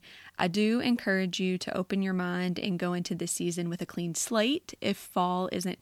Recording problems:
none

